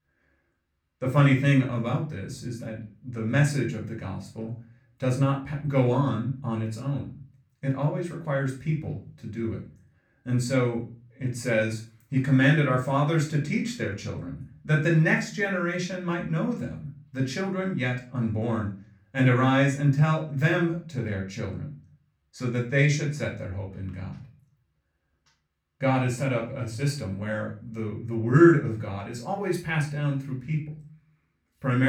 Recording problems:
off-mic speech; far
room echo; slight; dies away in 0.3 s
abrupt cut into speech; at the end

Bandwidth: 18.5 kHz